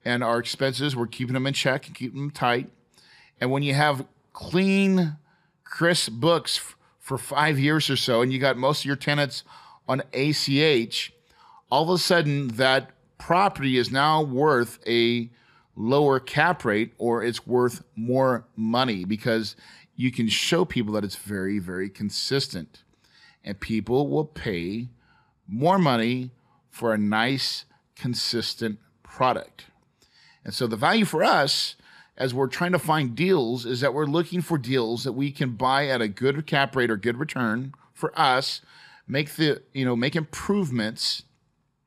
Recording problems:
uneven, jittery; strongly; from 1 to 40 s

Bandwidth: 14.5 kHz